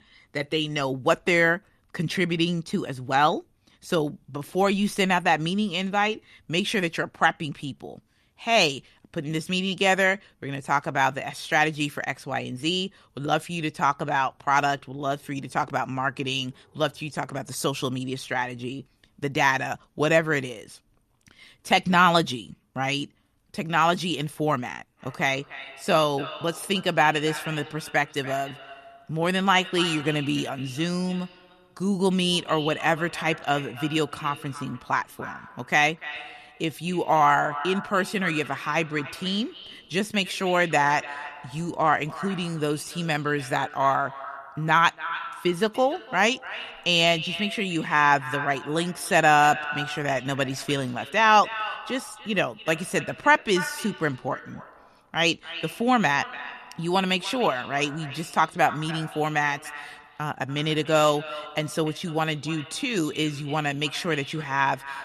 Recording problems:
echo of what is said; noticeable; from 25 s on; 290 ms later, 15 dB below the speech

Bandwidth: 13.5 kHz